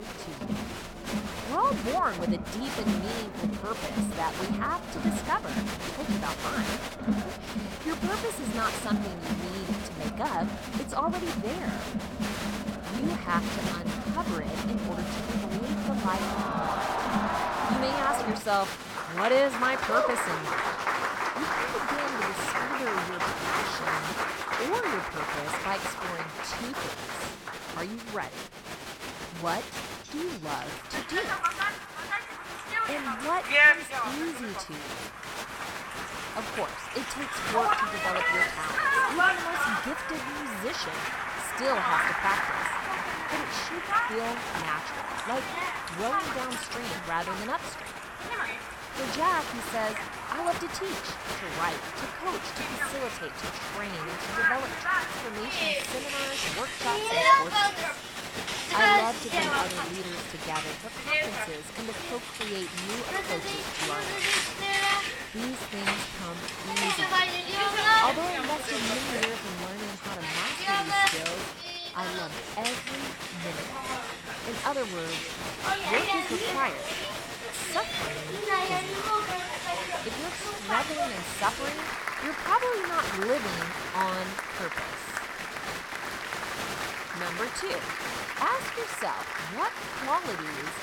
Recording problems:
crowd noise; very loud; throughout; 4 dB above the speech

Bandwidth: 17.5 kHz